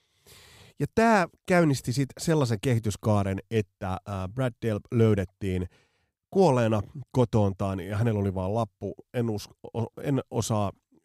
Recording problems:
none

